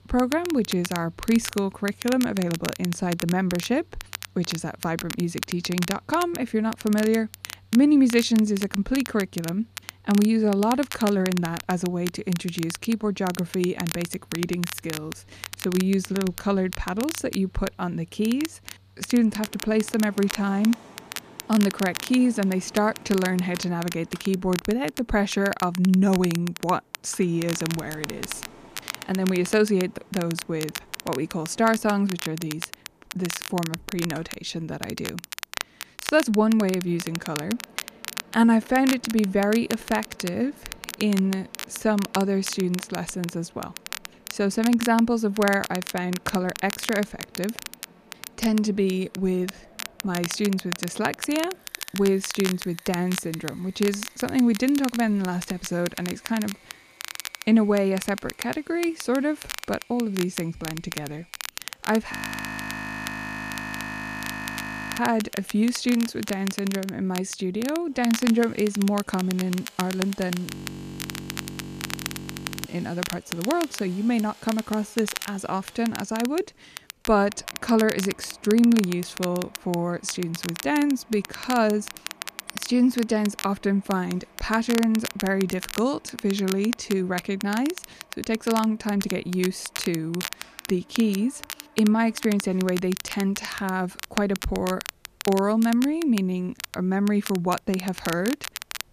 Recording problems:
crackle, like an old record; noticeable; 10 dB below the speech
machinery noise; faint; throughout; 25 dB below the speech
audio freezing; at 1:02 for 3 s and at 1:10 for 2 s

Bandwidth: 14.5 kHz